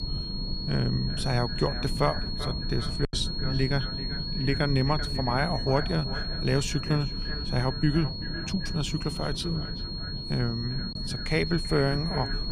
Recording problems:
echo of what is said; noticeable; throughout; 390 ms later, 15 dB below the speech
high-pitched whine; loud; throughout; 4.5 kHz, 6 dB below the speech
low rumble; noticeable; throughout; 15 dB below the speech
choppy; occasionally; at 3 s; 3% of the speech affected

